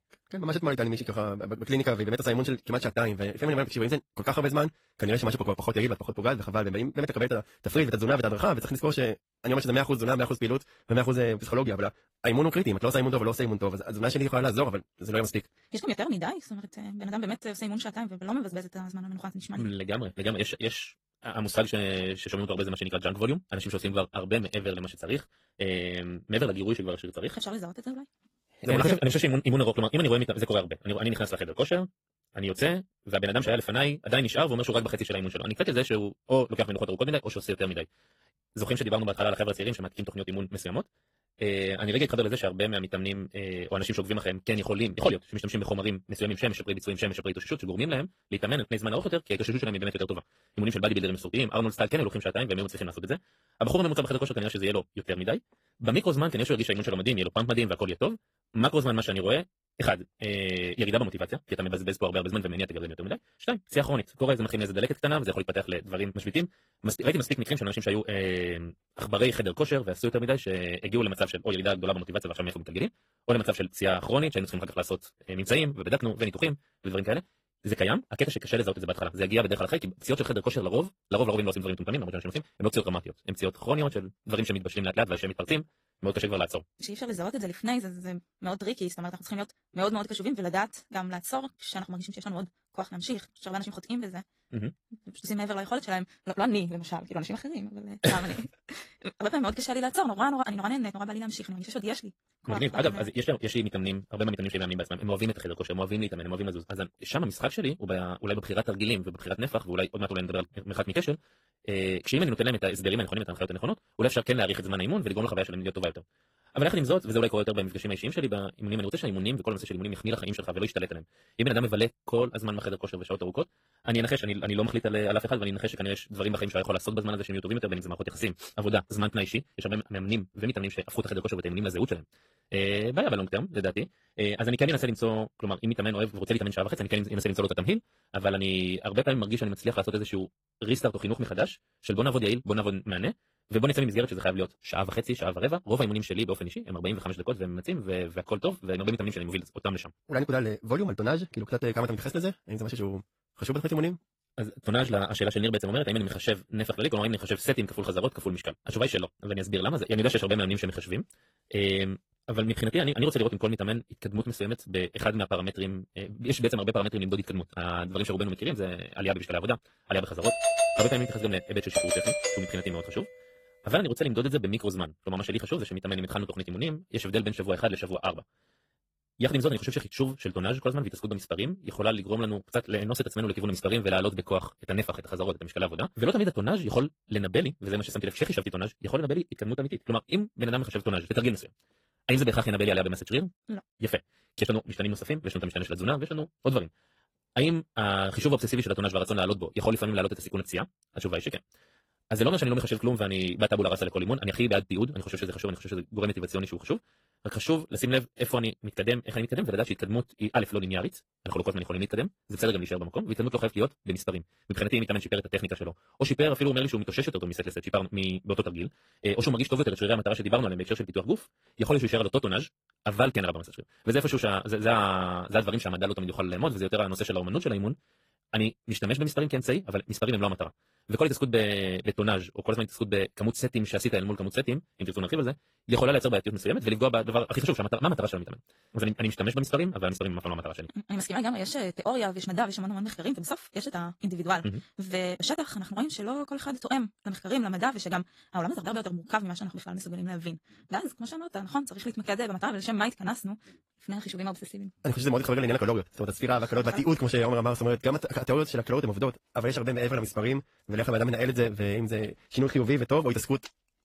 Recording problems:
wrong speed, natural pitch; too fast; 1.7 times normal speed
garbled, watery; slightly
doorbell; loud; from 2:50 to 2:52; peak 5 dB above the speech

